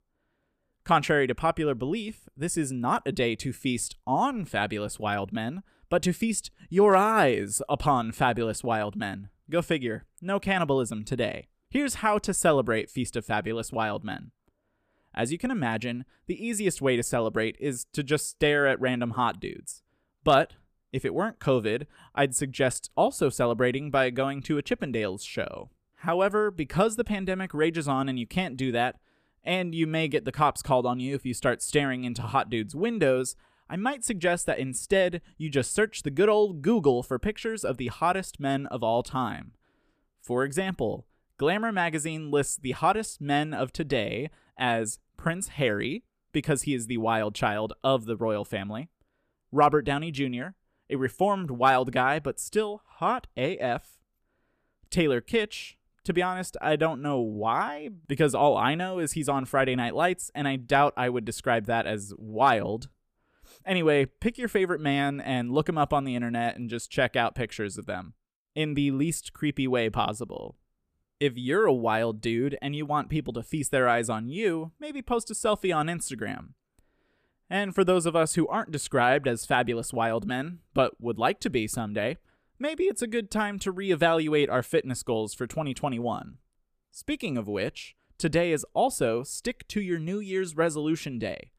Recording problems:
none

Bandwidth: 14.5 kHz